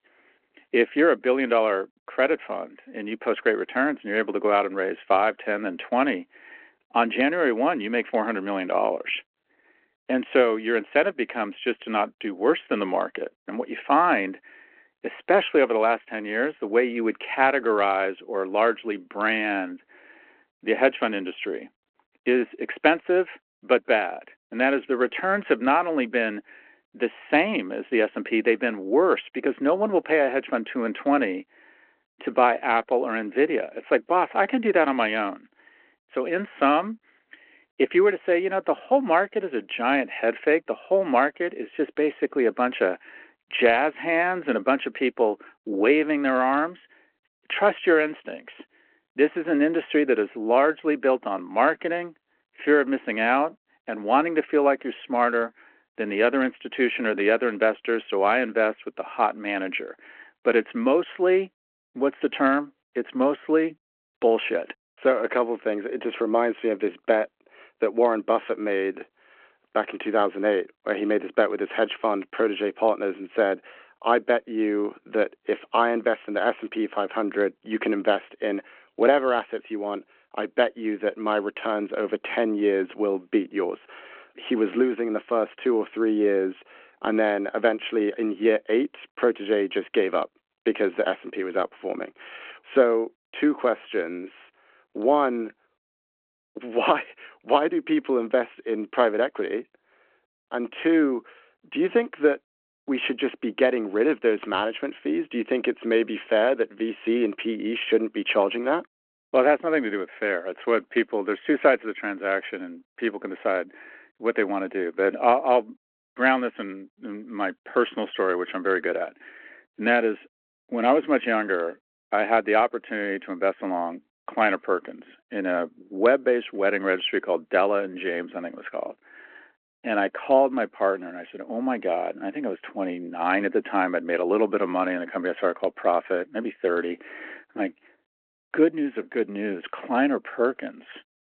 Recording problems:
phone-call audio

